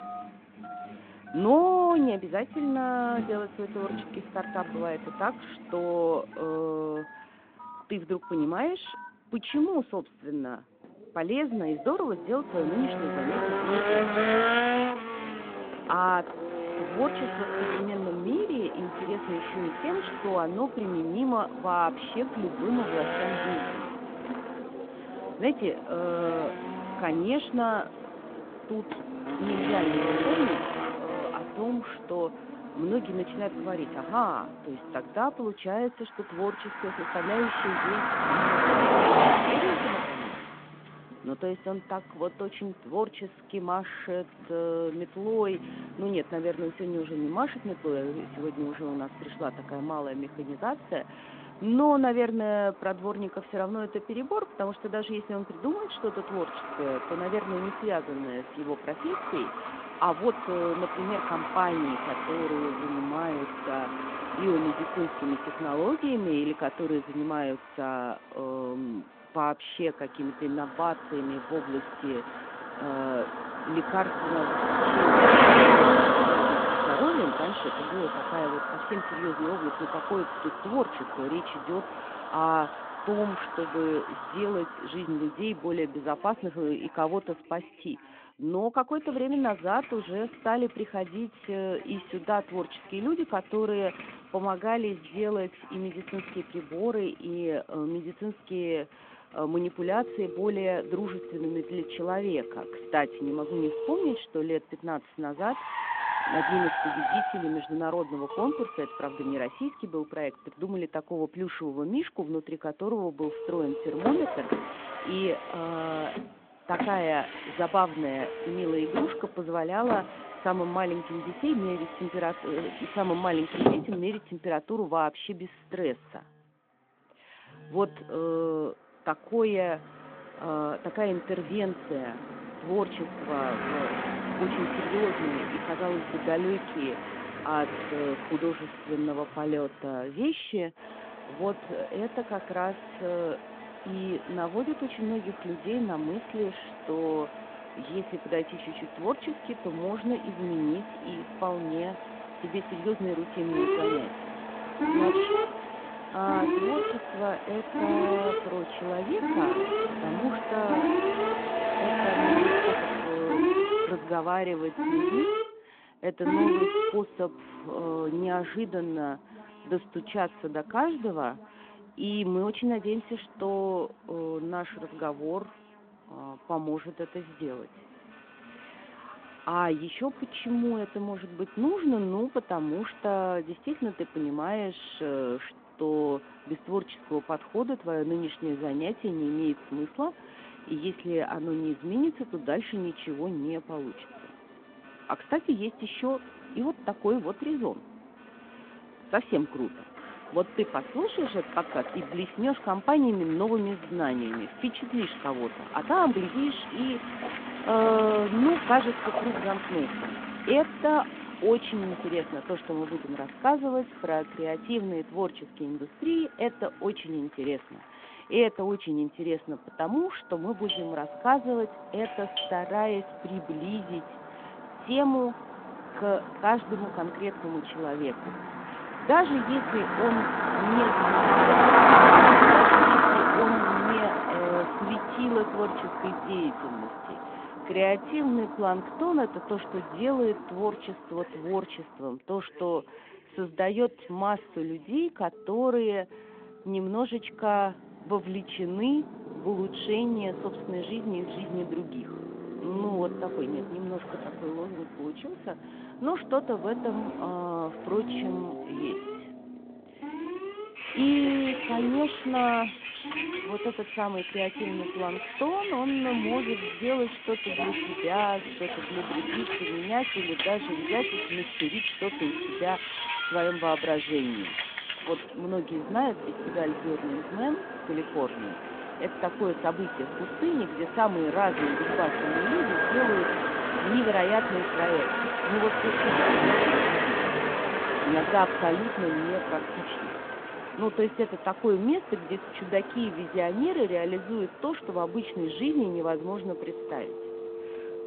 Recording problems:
phone-call audio
traffic noise; very loud; throughout; 2 dB above the speech
alarms or sirens; loud; throughout; 6 dB below the speech
uneven, jittery; strongly; from 1:00 to 4:13

